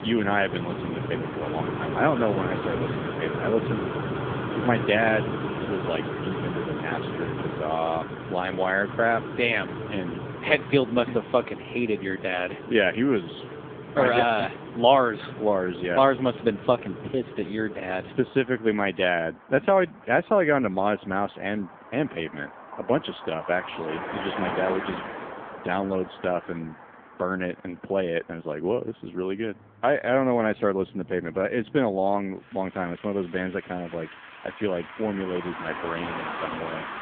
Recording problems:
phone-call audio; poor line; nothing above 3.5 kHz
traffic noise; loud; throughout; 7 dB below the speech

